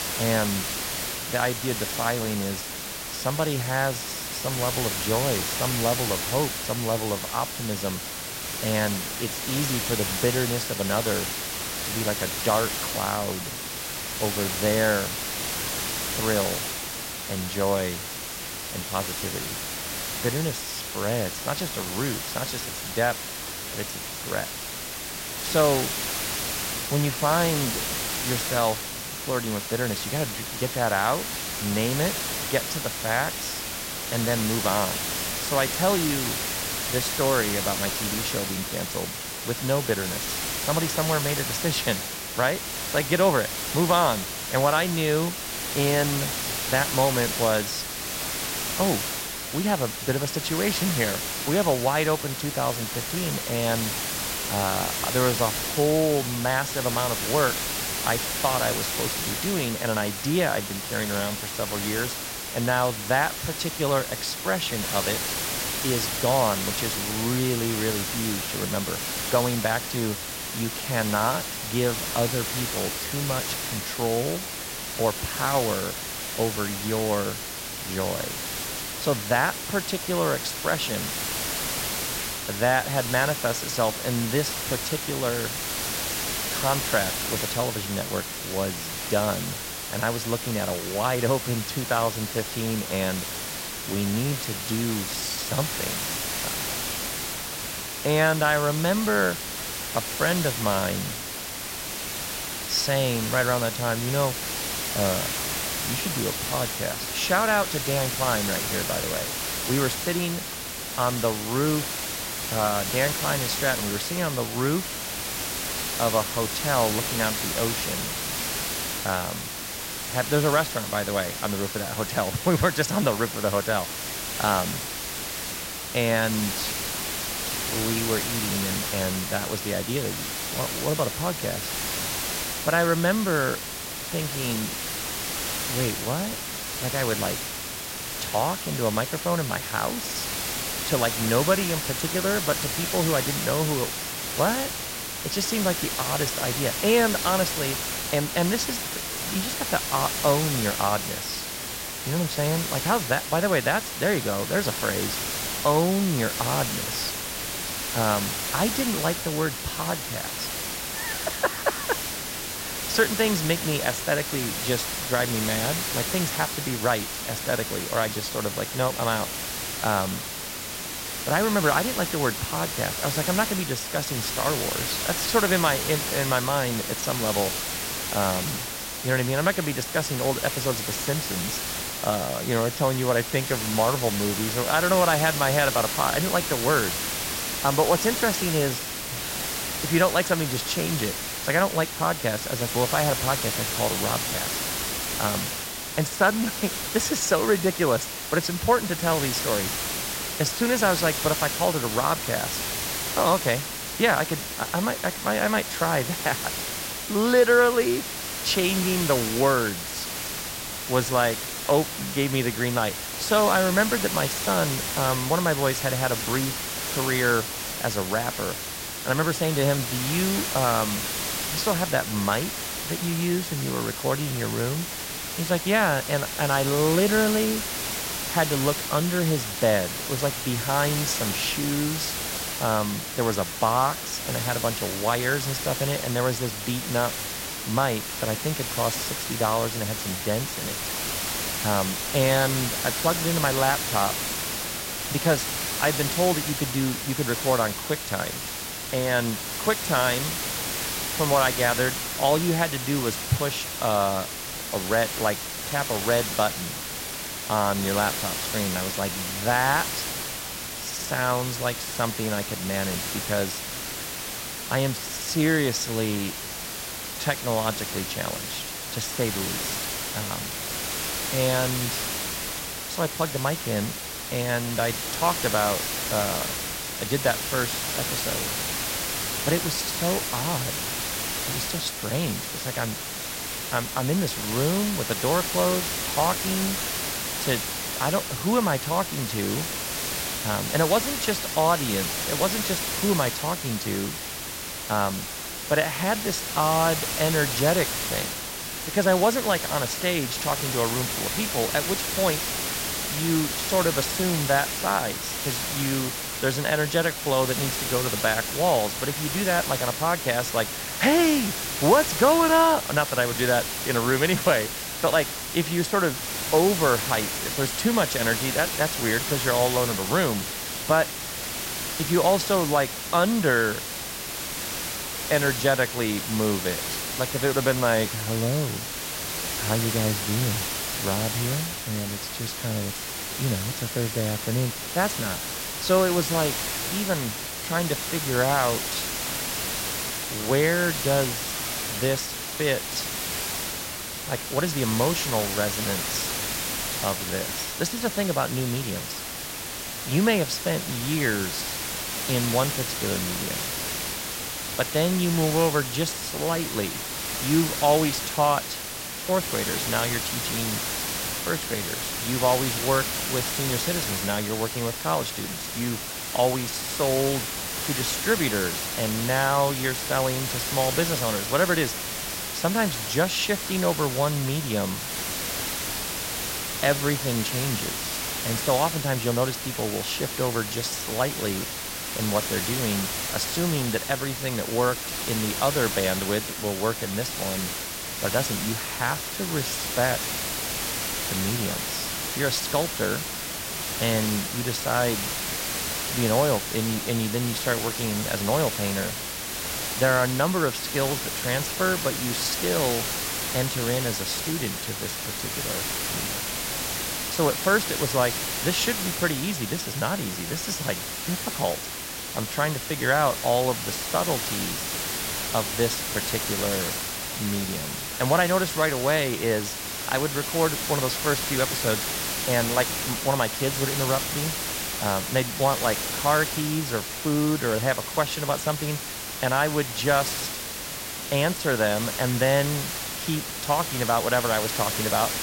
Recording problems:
hiss; loud; throughout; 2 dB below the speech

